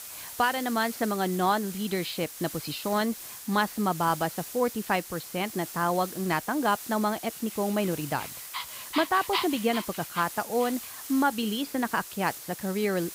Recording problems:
high frequencies cut off; noticeable; nothing above 5.5 kHz
hiss; noticeable; throughout; 10 dB below the speech
dog barking; noticeable; from 8 to 11 s; peak 2 dB below the speech

